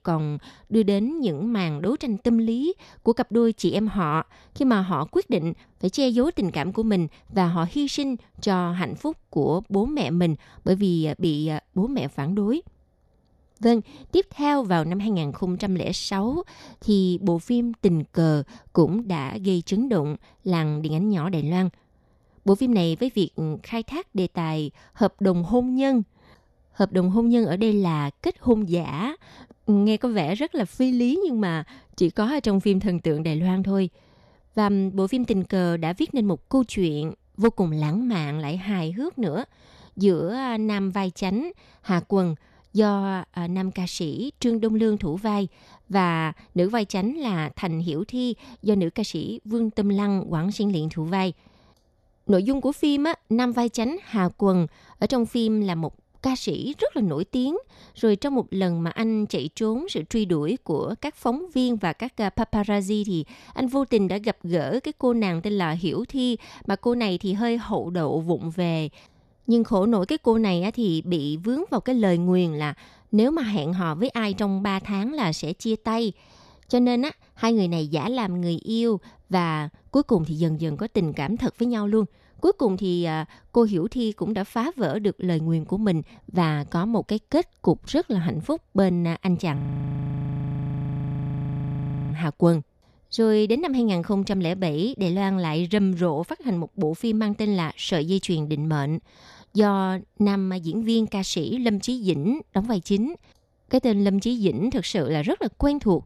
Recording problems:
audio freezing; at 1:30 for 2.5 s

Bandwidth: 13.5 kHz